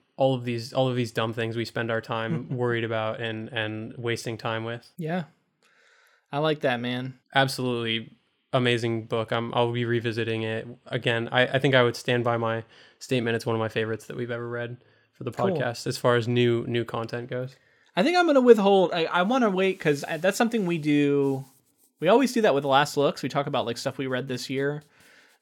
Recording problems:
none

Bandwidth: 17.5 kHz